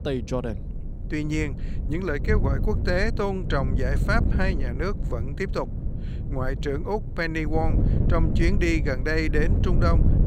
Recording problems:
wind noise on the microphone; occasional gusts; 10 dB below the speech

